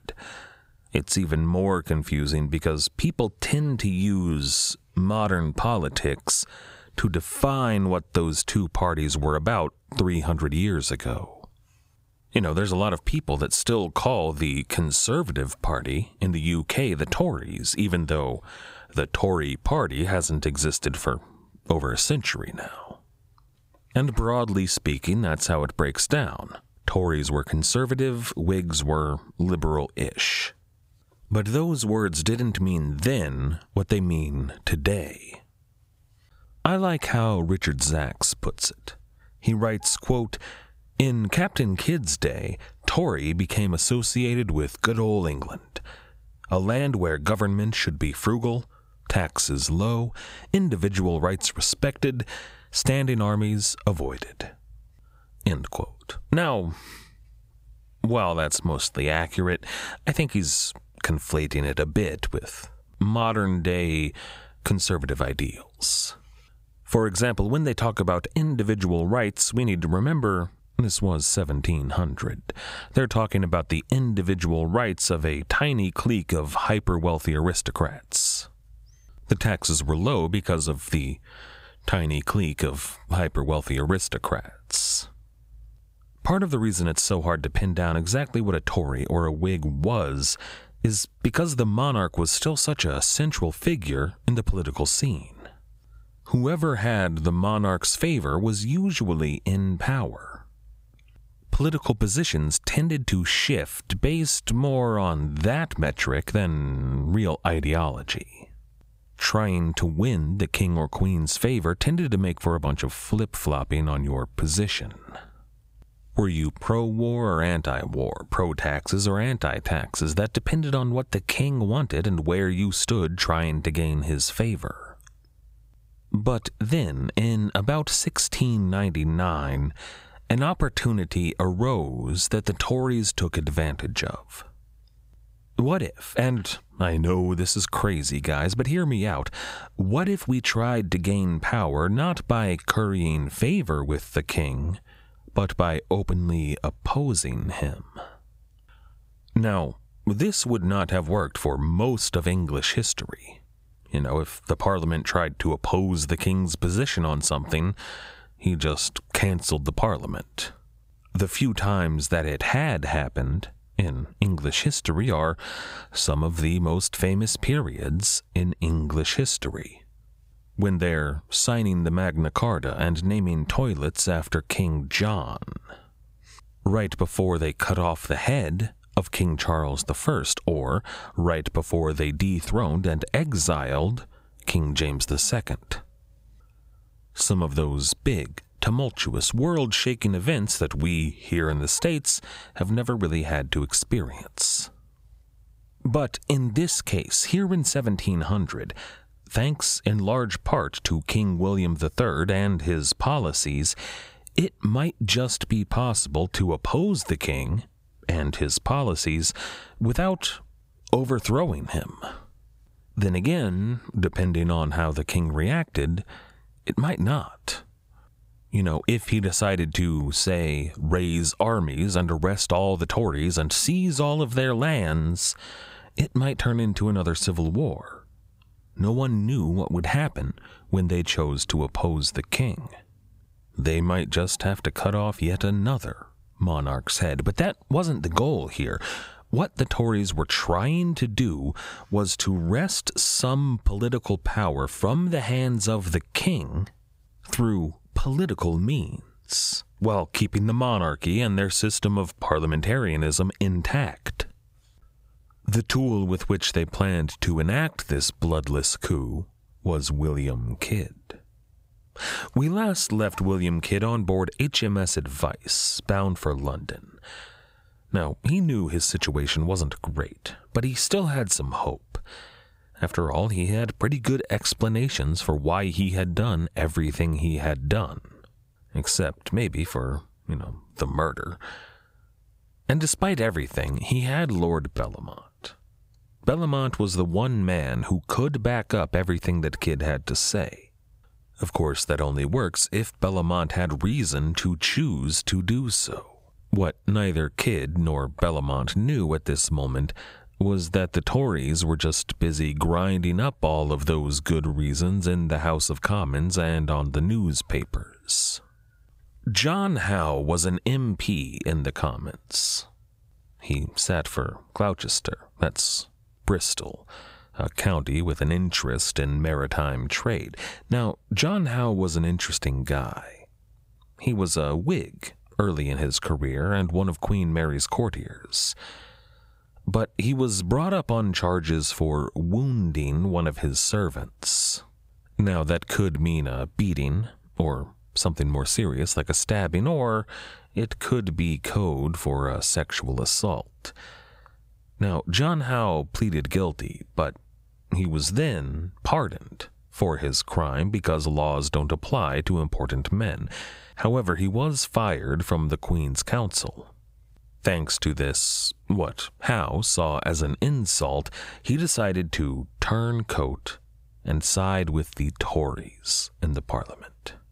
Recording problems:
squashed, flat; somewhat

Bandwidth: 15.5 kHz